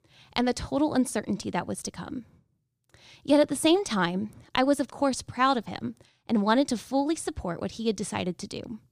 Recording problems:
none

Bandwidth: 15 kHz